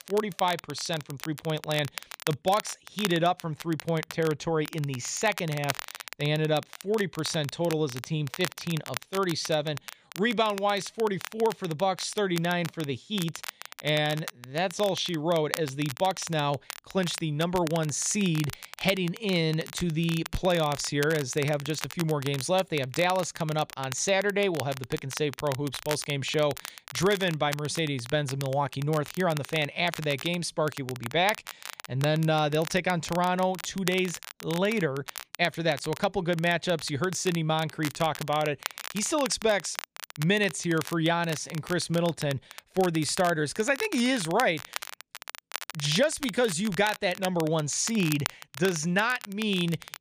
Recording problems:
crackle, like an old record; noticeable; 10 dB below the speech

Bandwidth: 15 kHz